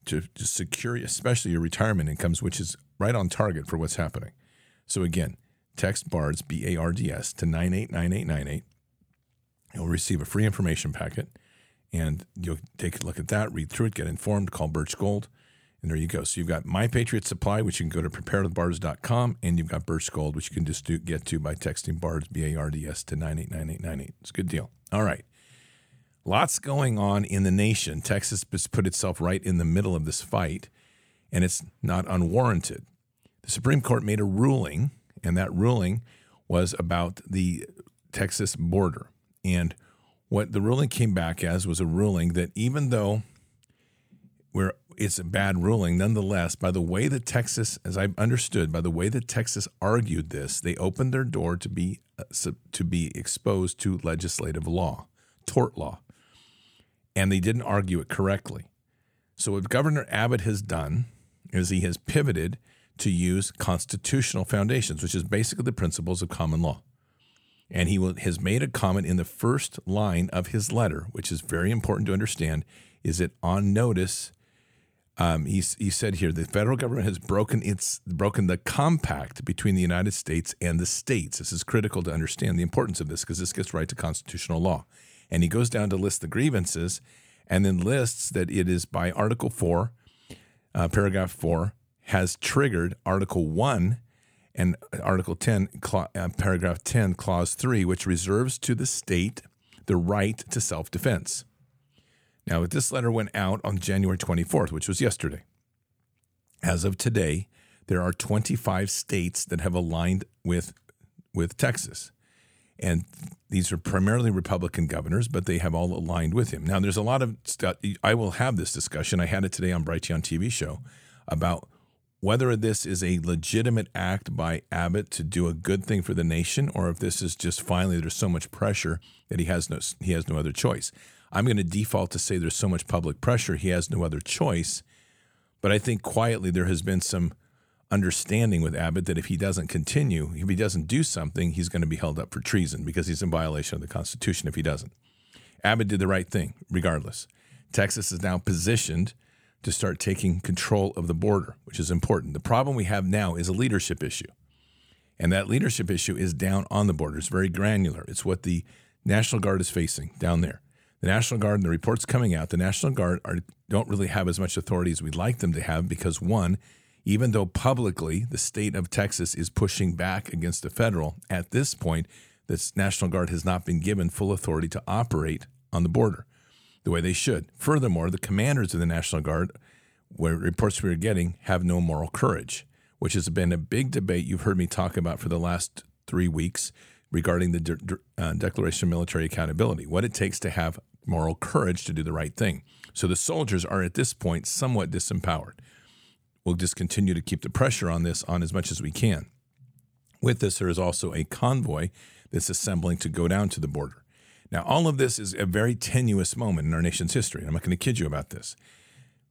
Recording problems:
none

